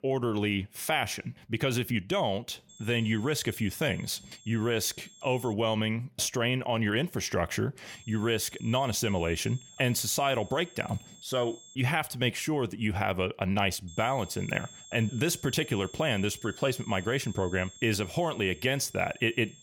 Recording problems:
high-pitched whine; noticeable; from 2.5 to 5.5 s, from 8 to 12 s and from 14 s on; 7.5 kHz, 20 dB below the speech

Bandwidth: 17 kHz